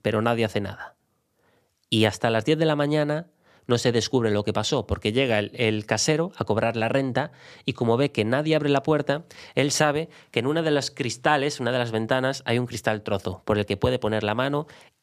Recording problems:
none

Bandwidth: 14.5 kHz